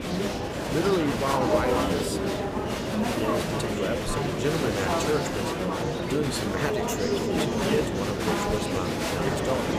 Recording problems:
murmuring crowd; very loud; throughout; 3 dB above the speech

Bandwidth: 15 kHz